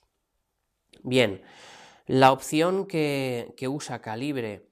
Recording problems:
none

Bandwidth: 14.5 kHz